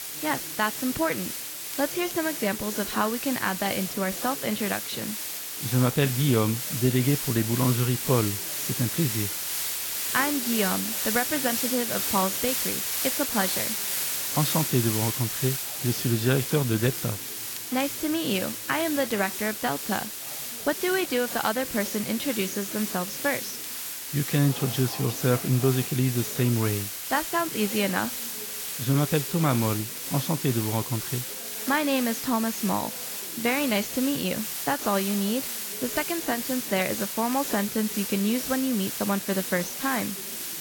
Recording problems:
garbled, watery; badly; nothing above 7.5 kHz
hiss; loud; throughout; 2 dB below the speech
chatter from many people; faint; throughout; 20 dB below the speech
crackle, like an old record; faint; 20 dB below the speech

